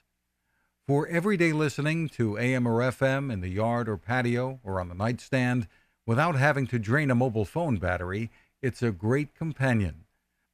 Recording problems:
none

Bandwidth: 14.5 kHz